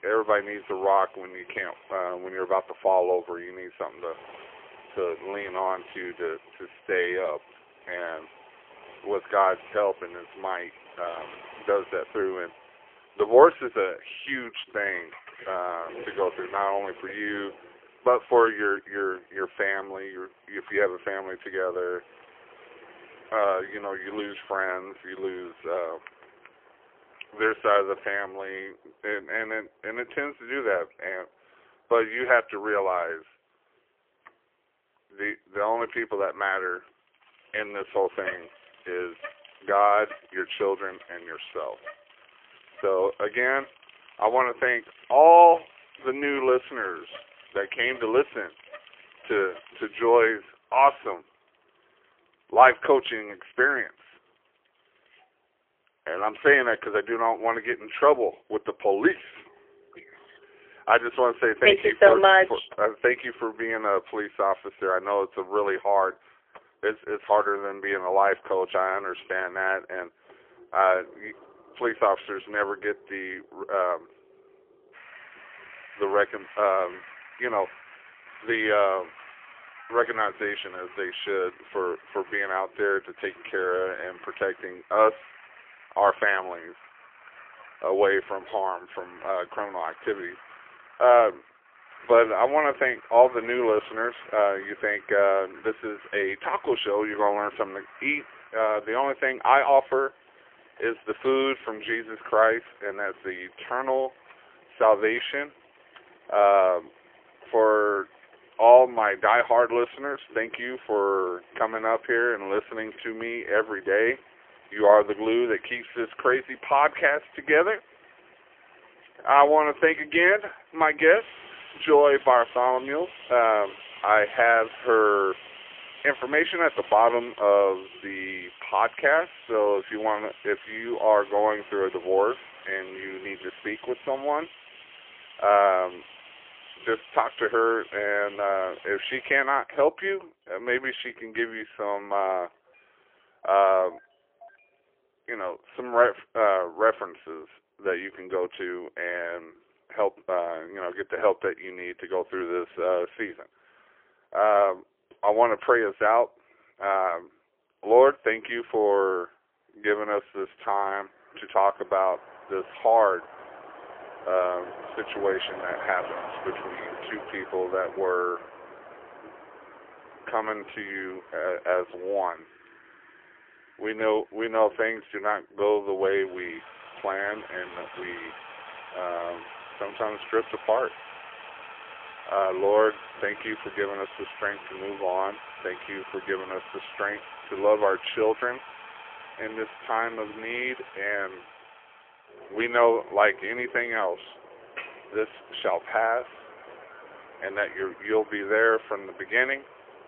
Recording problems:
phone-call audio; poor line; nothing above 3.5 kHz
traffic noise; faint; throughout; 20 dB below the speech

